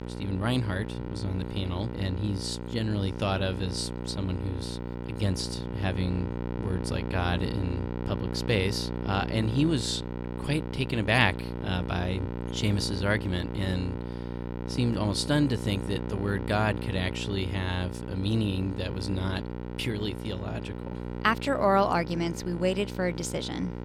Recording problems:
electrical hum; loud; throughout; 60 Hz, 9 dB below the speech

